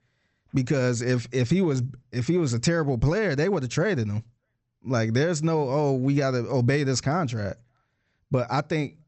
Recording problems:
high frequencies cut off; noticeable; nothing above 8 kHz

